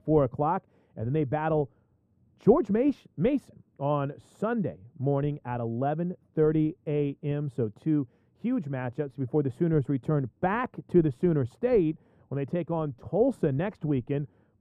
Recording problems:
muffled; very; fading above 1.5 kHz

